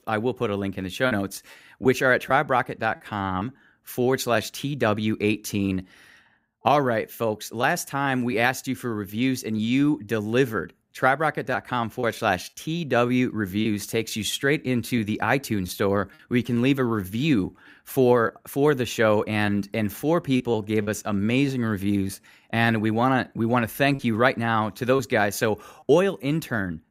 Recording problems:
choppy; occasionally; 2% of the speech affected

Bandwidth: 15.5 kHz